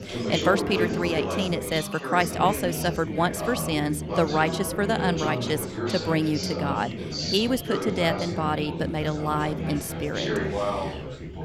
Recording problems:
chatter from many people; loud; throughout; 3 dB below the speech

